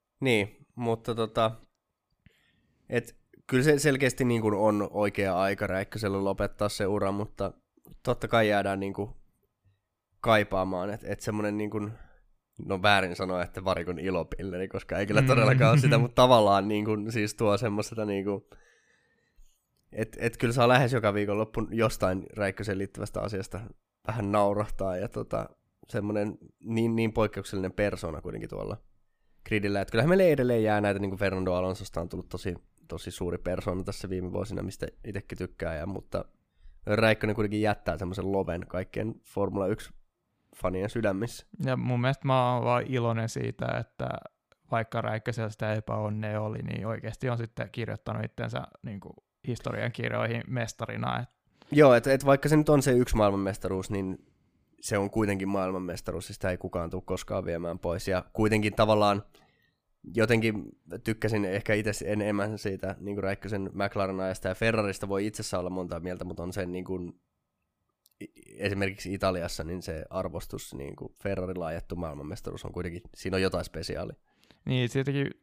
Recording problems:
none

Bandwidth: 15 kHz